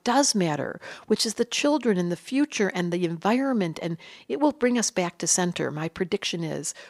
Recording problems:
none

